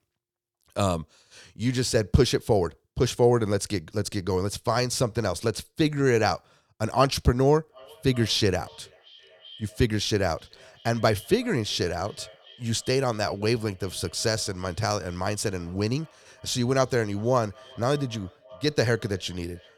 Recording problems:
echo of what is said; faint; from 7.5 s on; 380 ms later, 25 dB below the speech

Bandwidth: 19 kHz